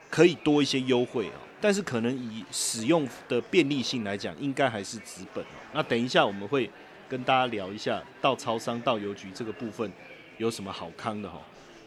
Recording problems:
murmuring crowd; noticeable; throughout; 20 dB below the speech

